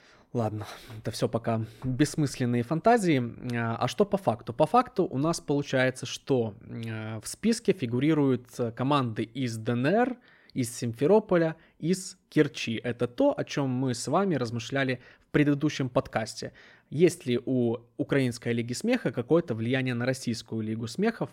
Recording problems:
none

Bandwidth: 16 kHz